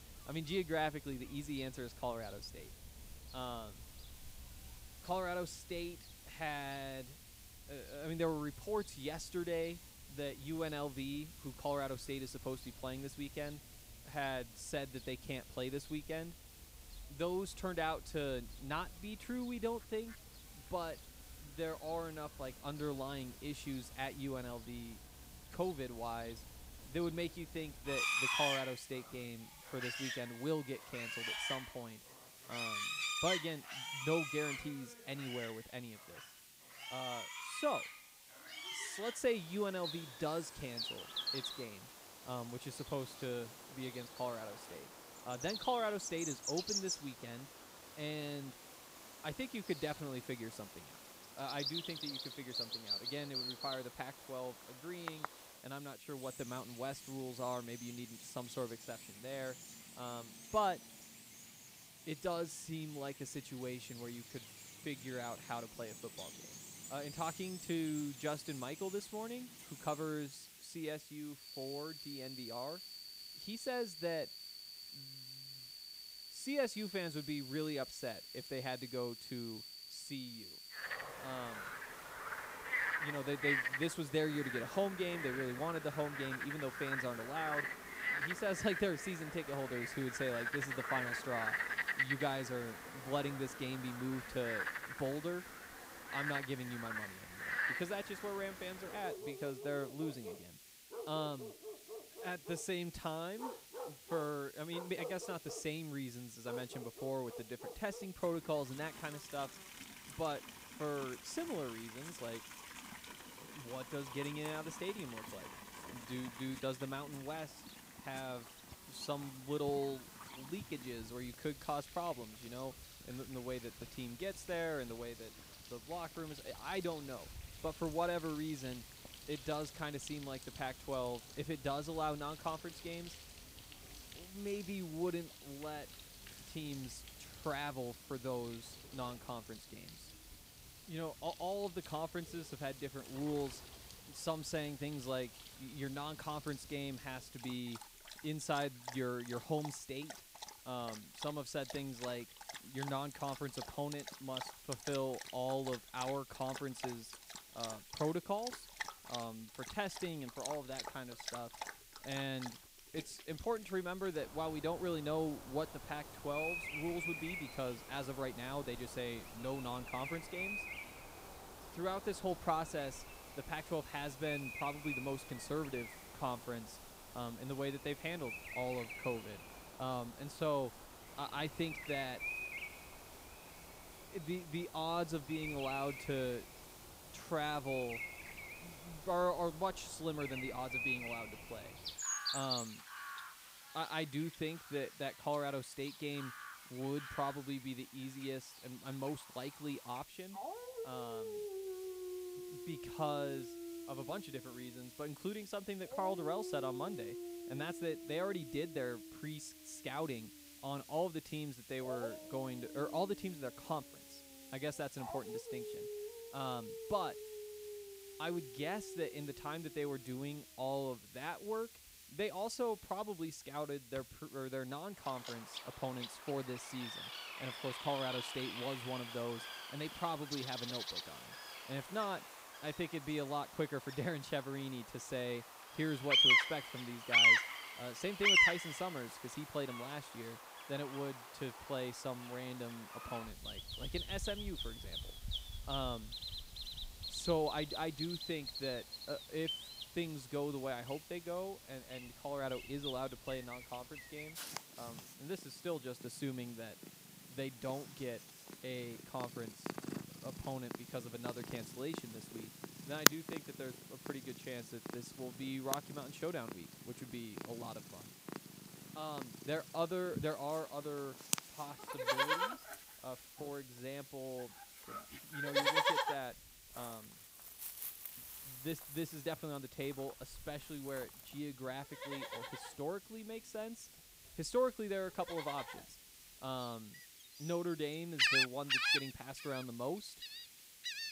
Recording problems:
animal sounds; very loud; throughout; 1 dB above the speech
hiss; noticeable; throughout; 15 dB below the speech

